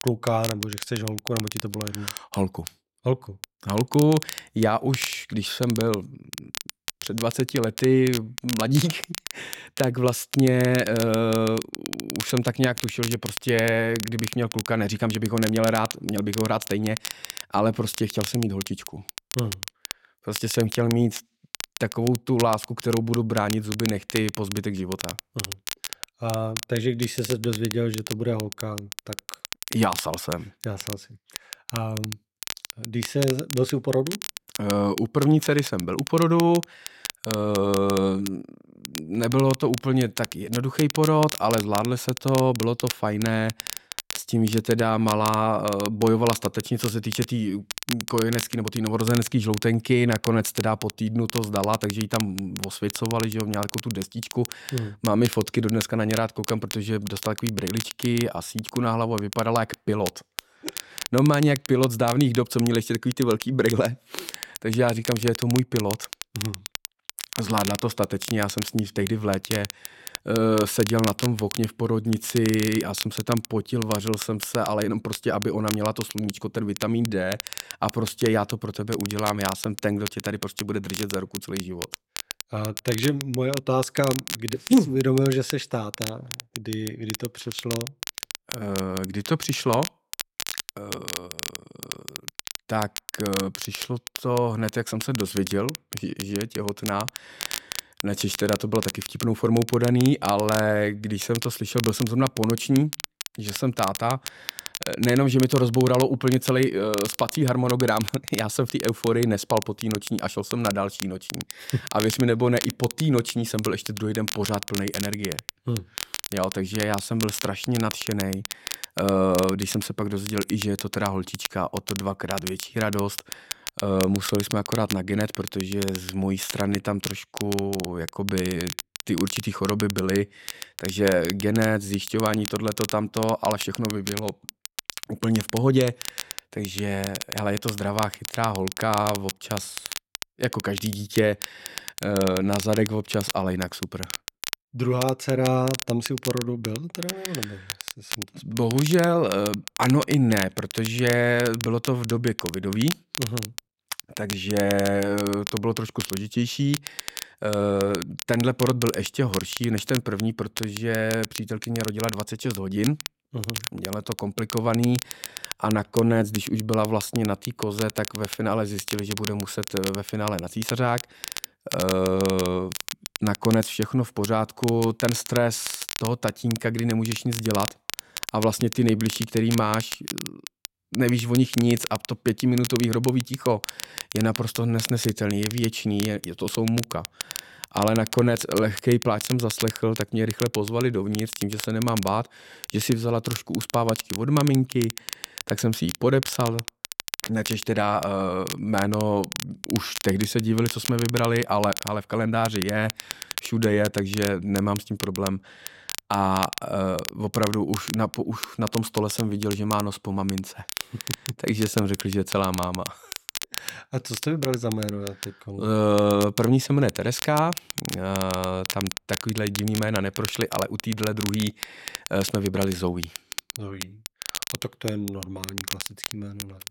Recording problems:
crackle, like an old record; loud; 9 dB below the speech

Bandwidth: 16.5 kHz